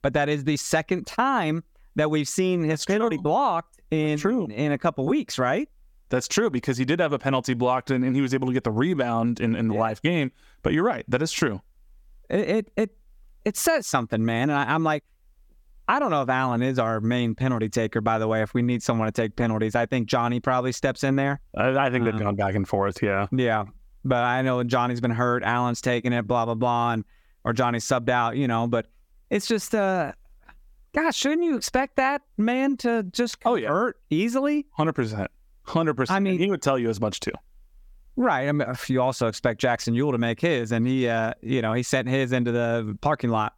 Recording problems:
squashed, flat; somewhat

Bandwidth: 17.5 kHz